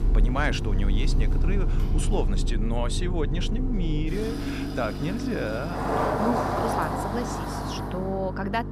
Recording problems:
traffic noise; very loud; throughout; 2 dB above the speech
electrical hum; loud; throughout; 50 Hz, 10 dB below the speech

